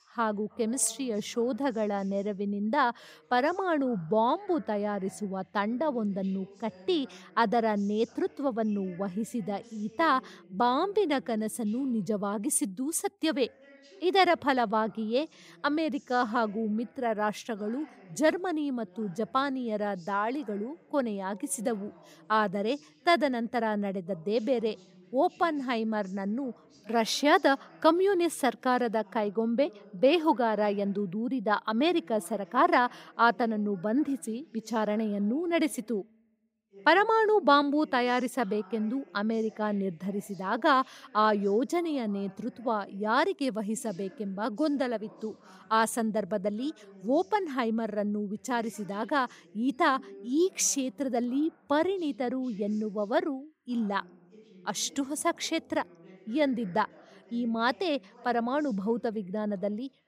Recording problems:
voice in the background; faint; throughout; 25 dB below the speech

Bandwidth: 15.5 kHz